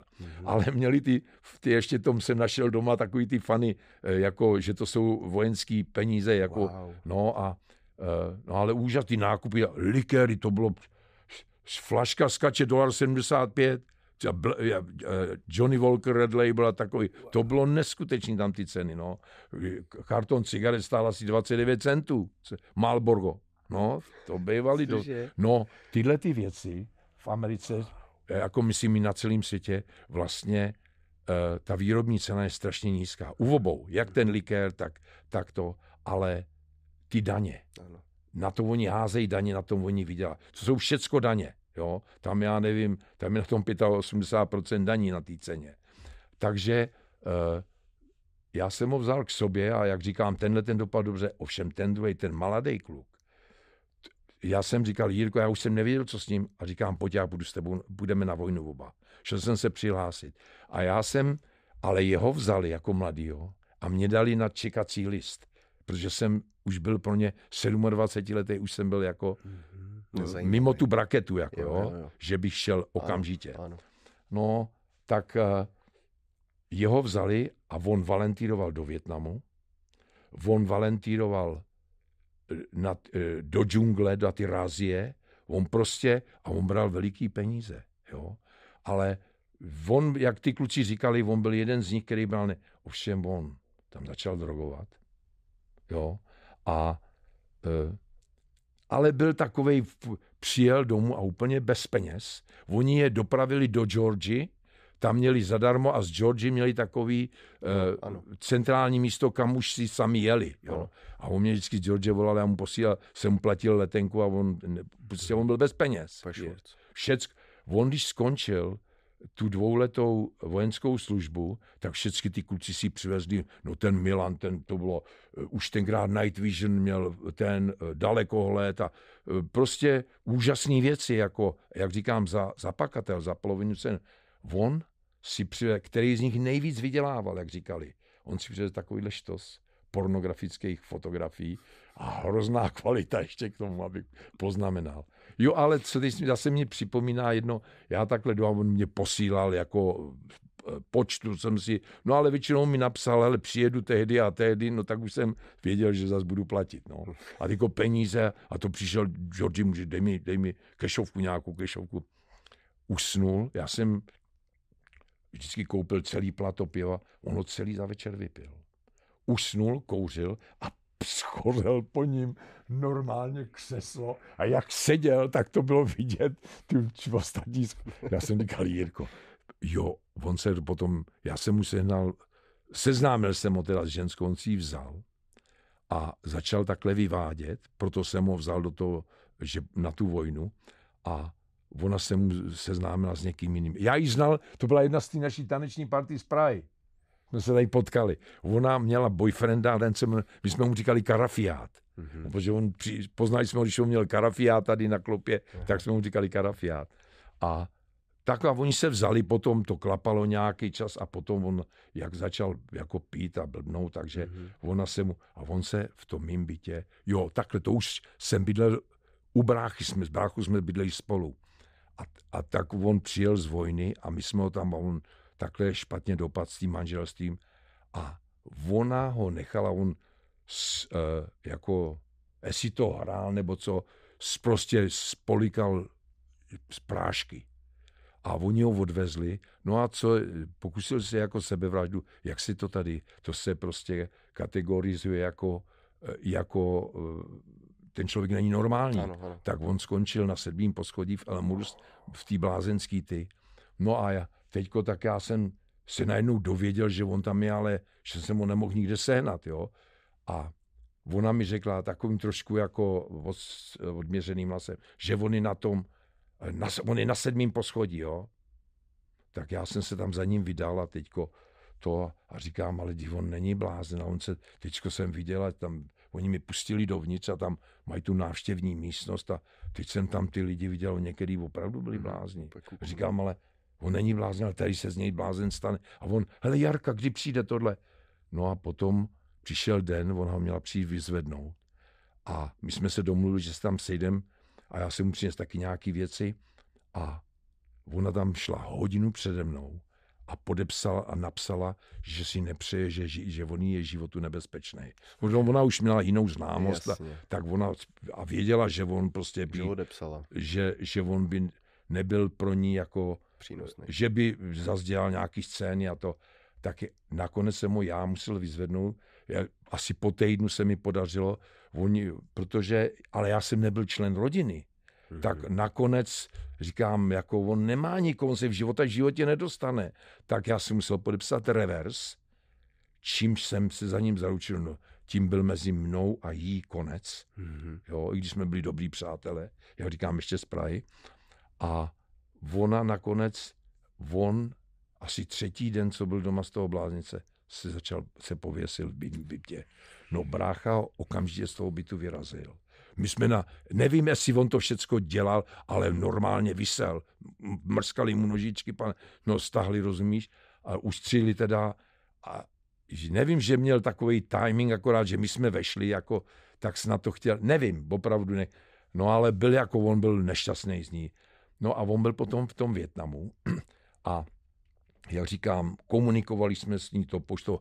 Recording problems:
none

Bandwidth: 15 kHz